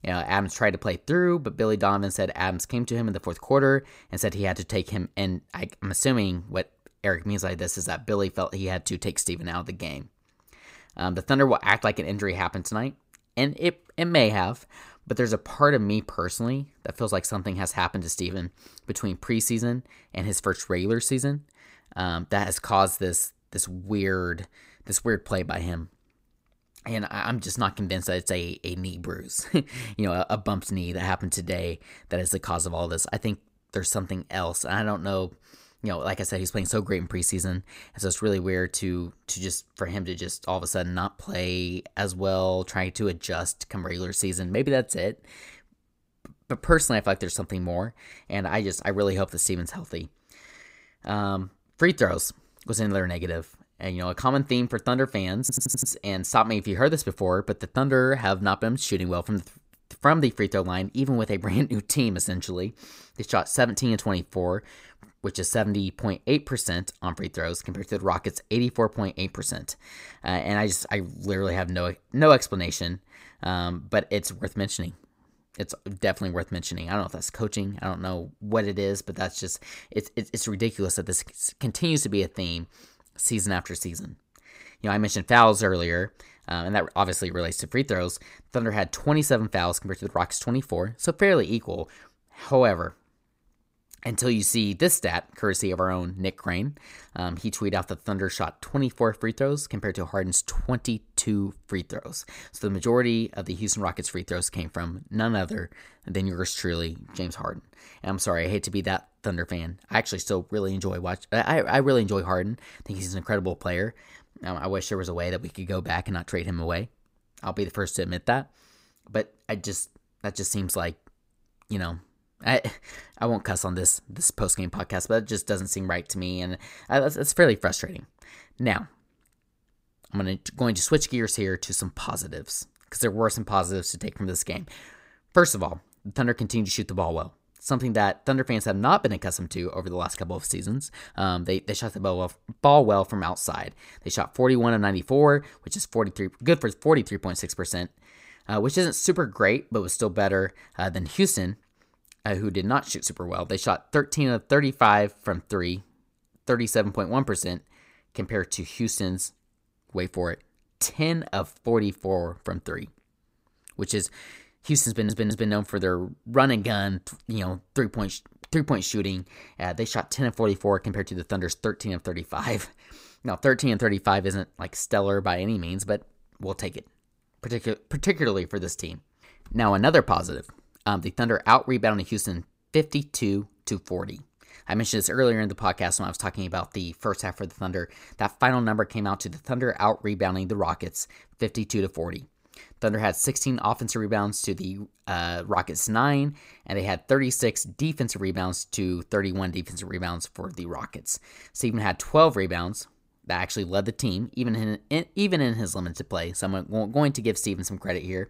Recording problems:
audio stuttering; at 55 s and at 2:45

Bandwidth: 15.5 kHz